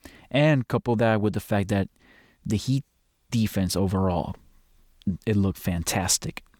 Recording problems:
none

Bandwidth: 19 kHz